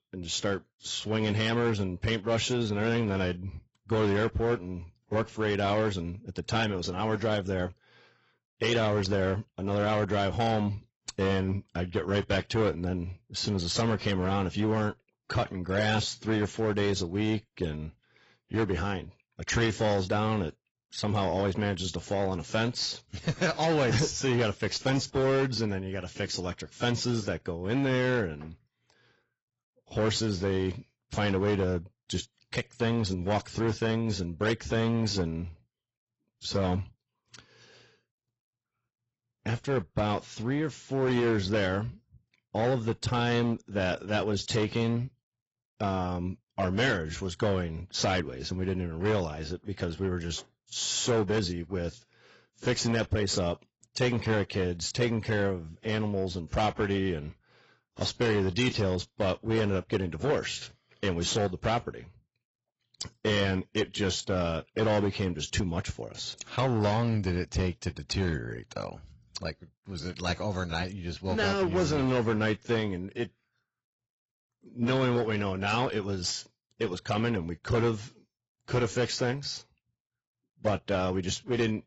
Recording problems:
garbled, watery; badly; nothing above 7.5 kHz
distortion; slight; 8% of the sound clipped

